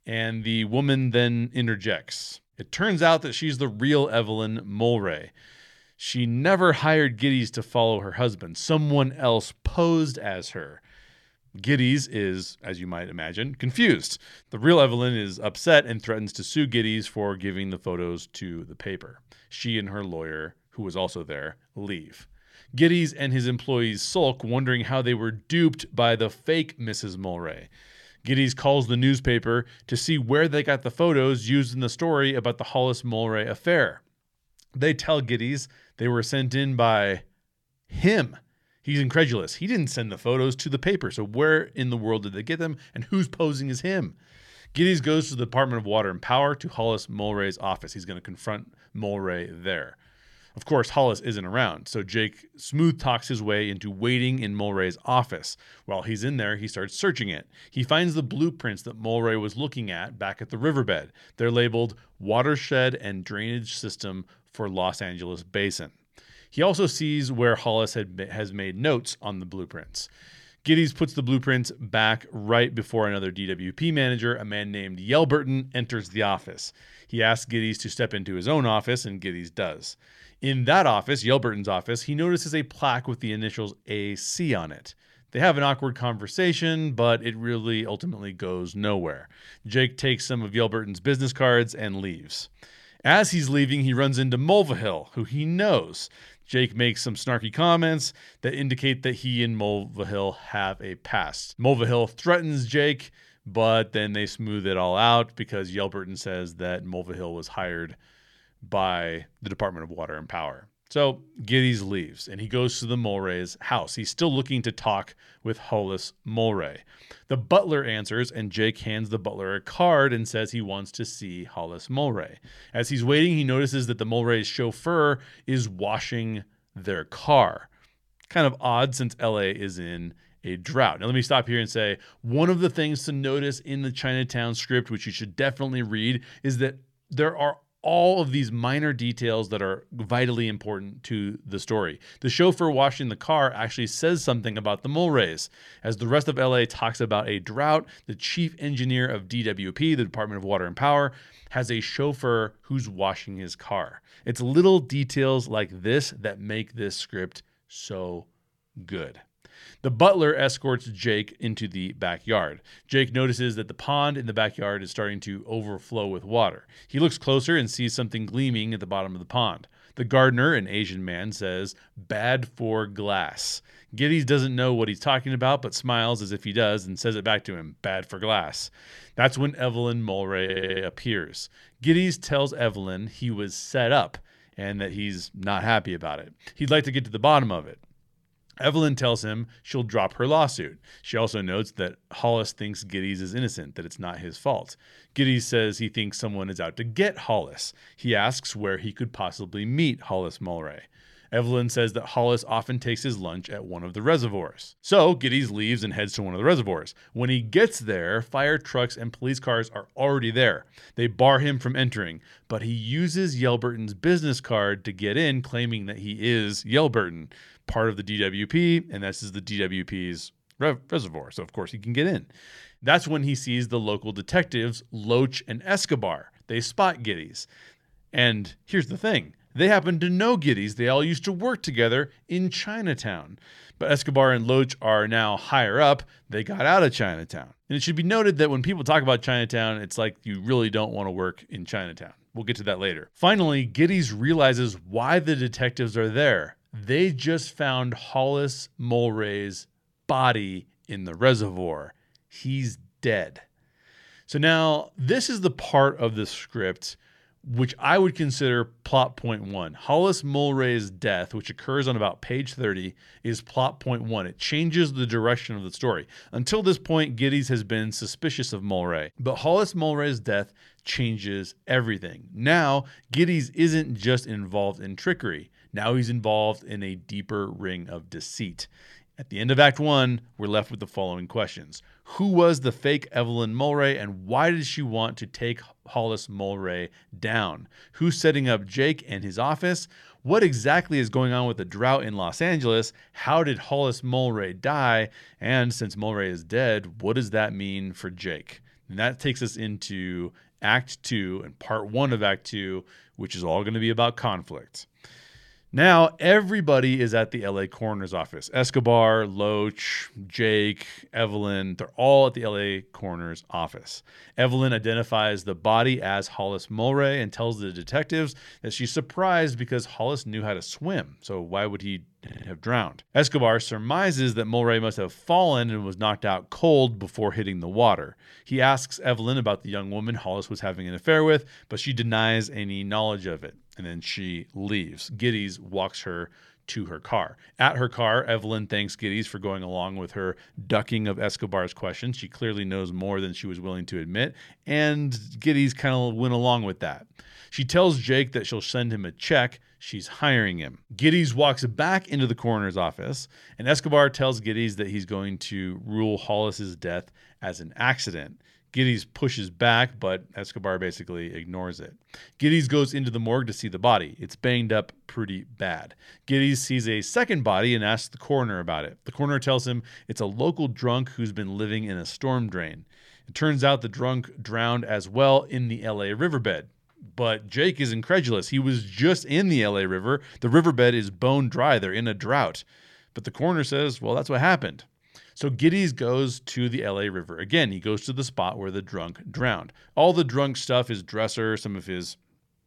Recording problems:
audio stuttering; at 3:00 and at 5:22

